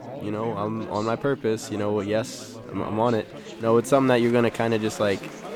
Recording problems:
chatter from many people; noticeable; throughout; 15 dB below the speech

